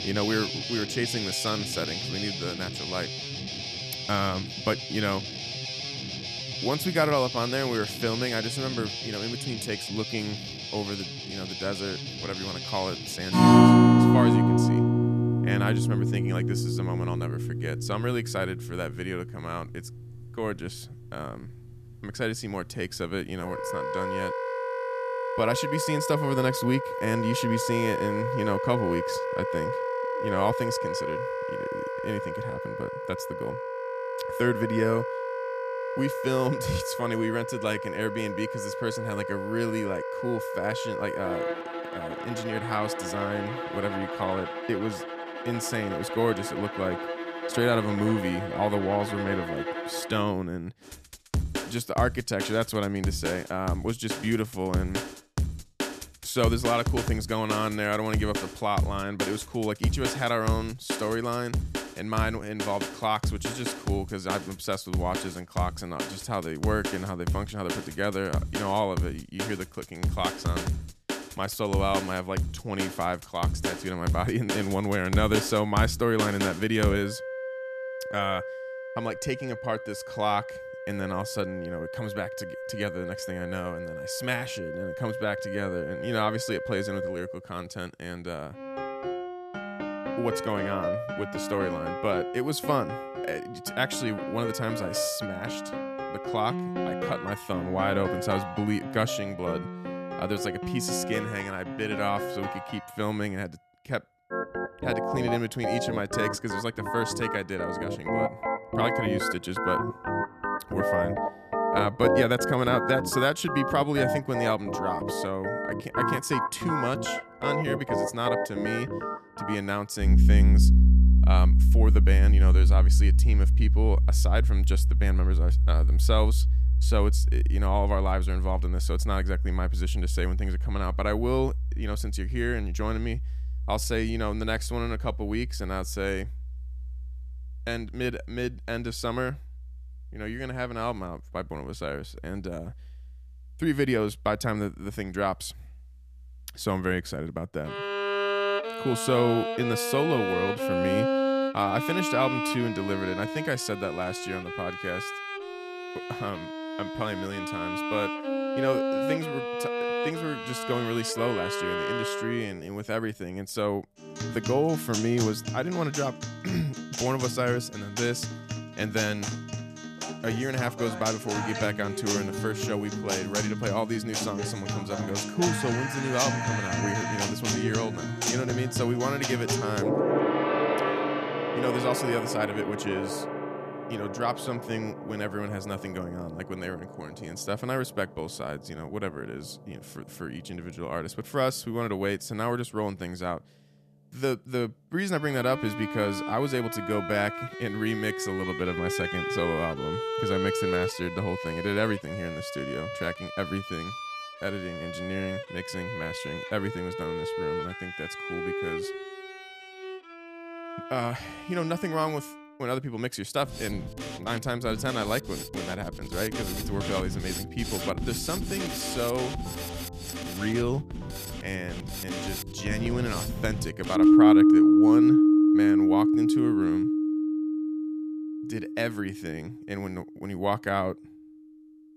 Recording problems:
background music; very loud; throughout; 2 dB above the speech

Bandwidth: 14.5 kHz